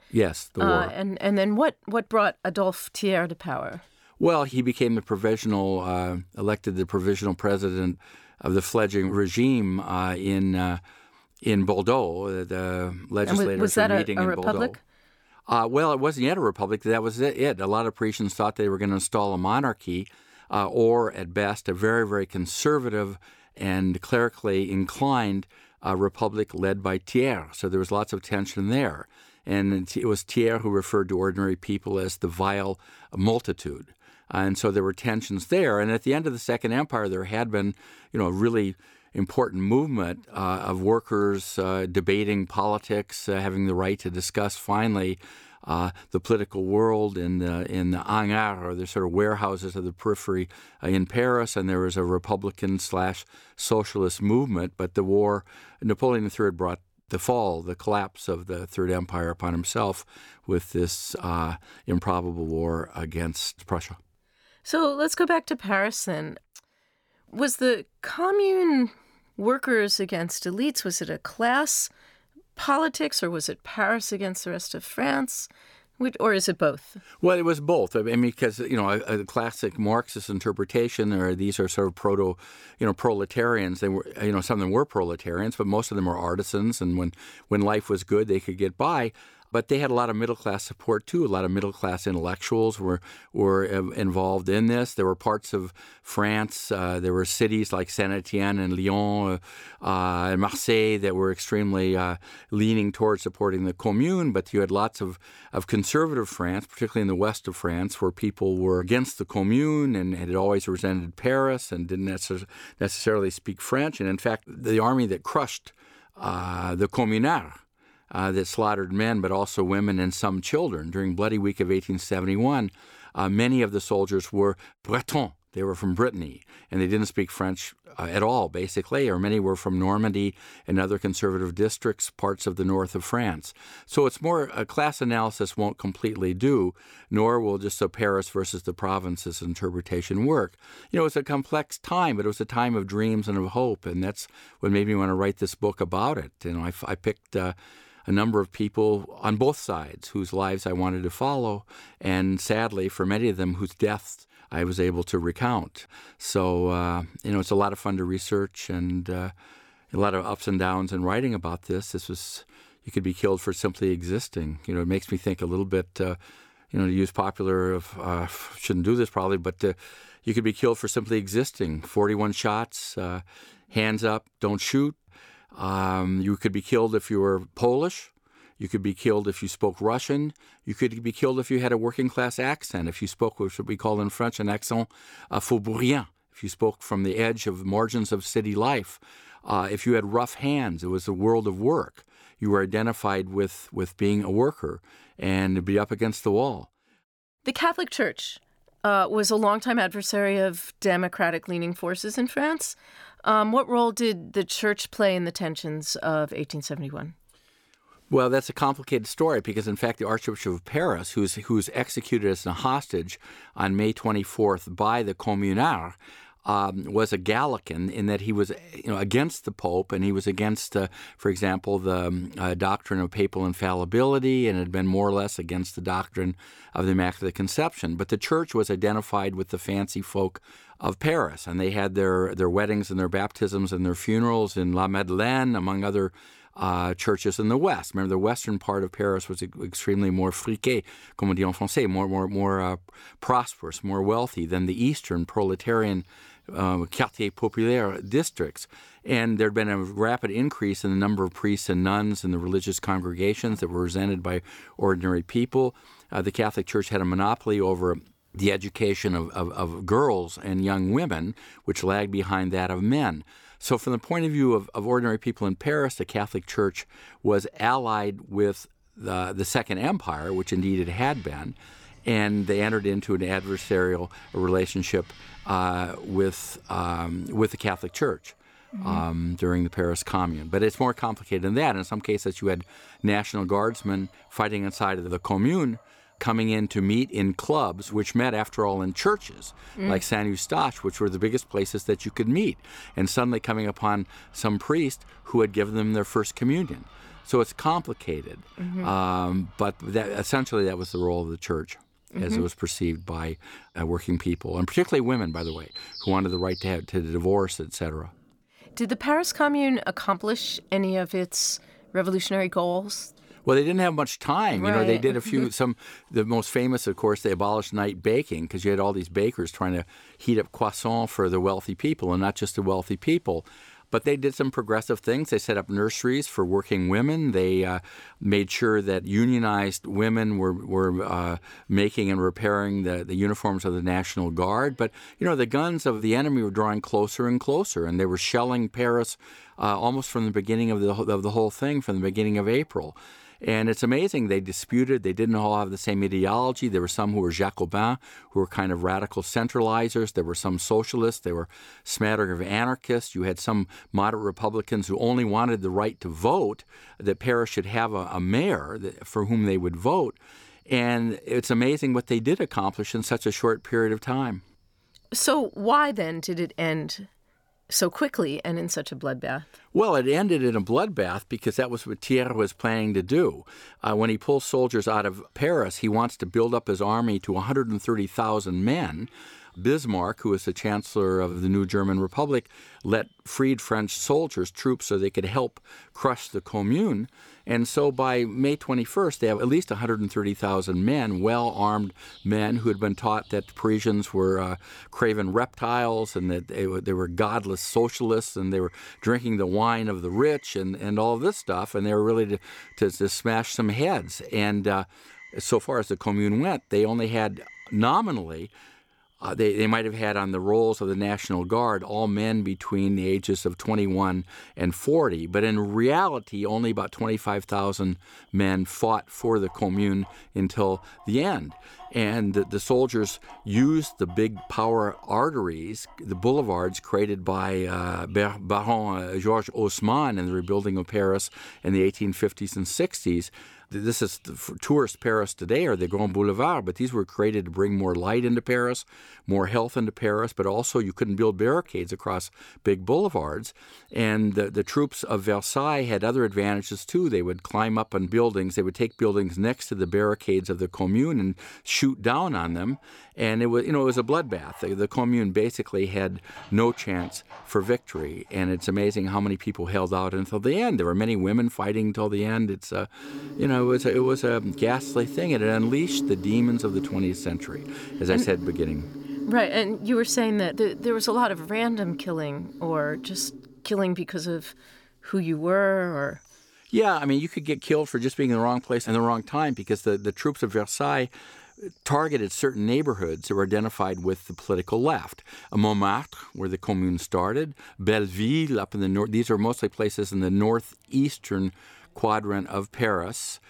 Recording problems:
animal sounds; noticeable; from 4:05 on; 20 dB below the speech

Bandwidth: 18.5 kHz